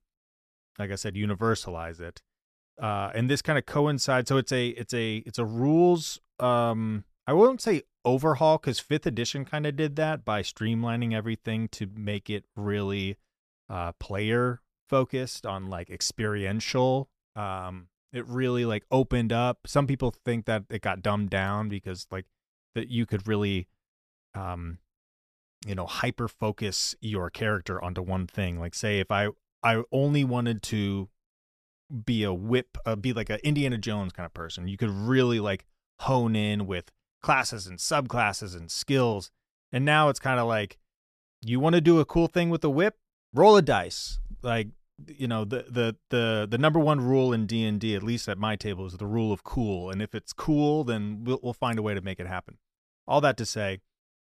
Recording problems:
none

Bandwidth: 14 kHz